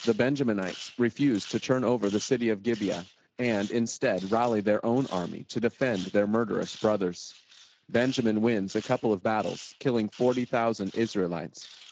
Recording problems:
garbled, watery; slightly
machinery noise; noticeable; throughout; 20 dB below the speech

